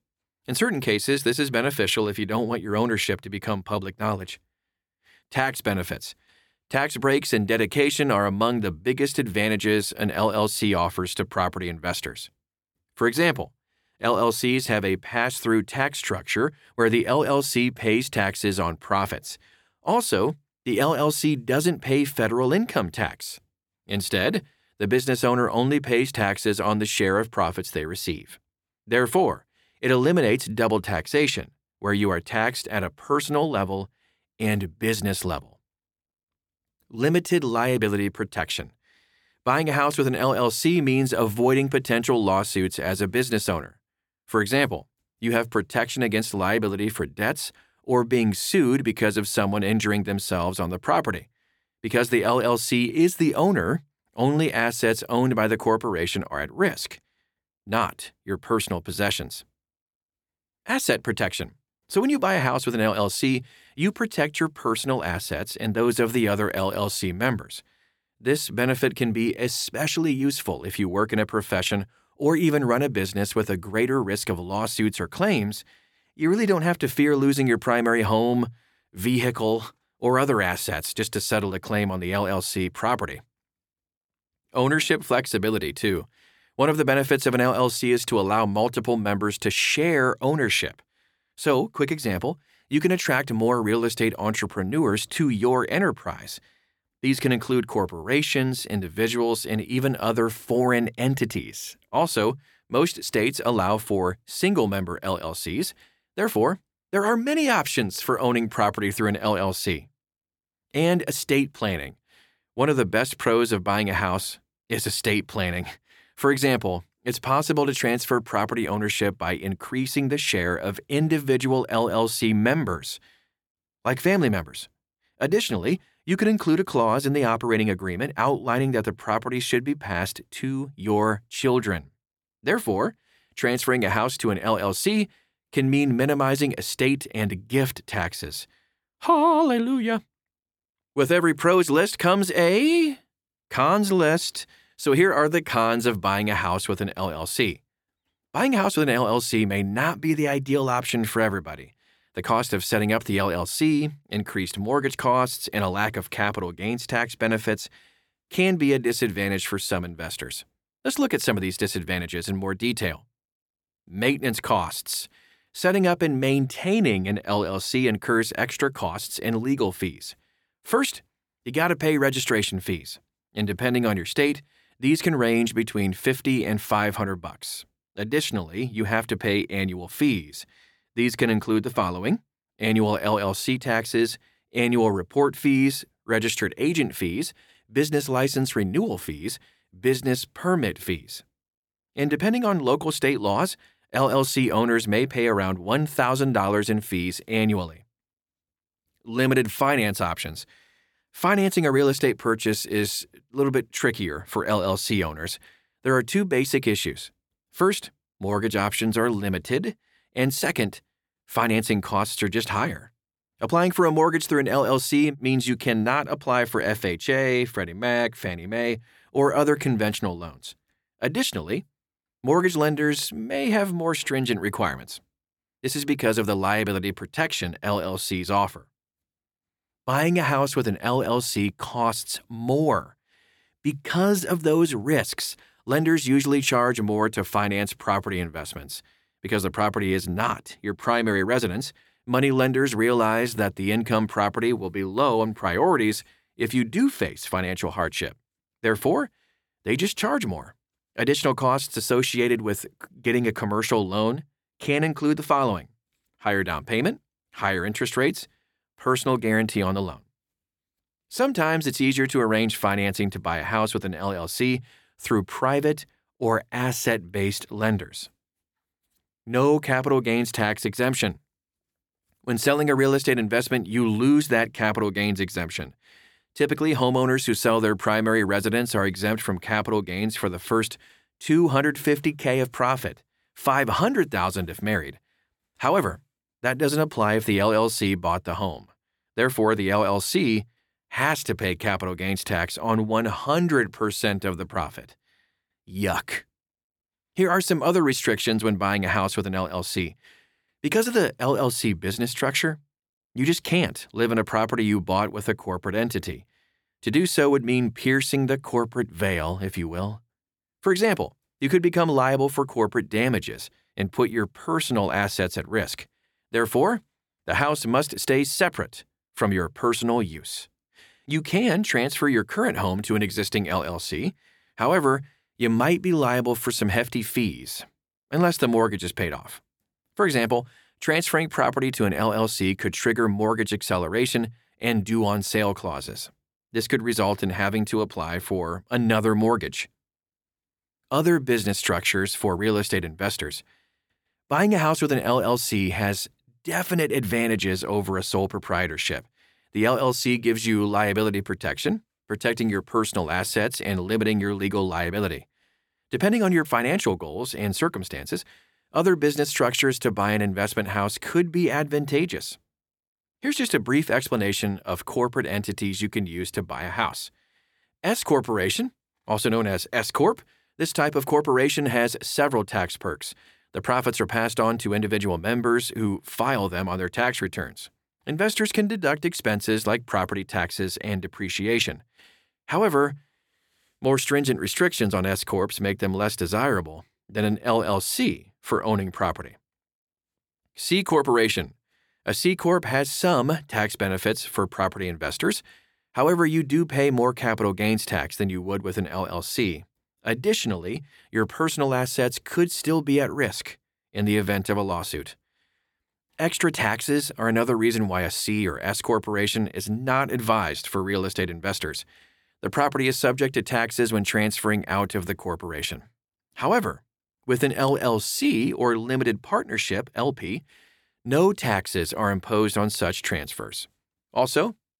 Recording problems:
none

